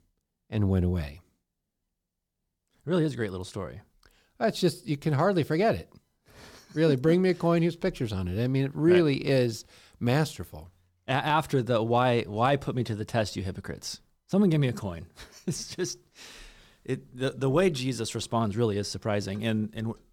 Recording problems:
none

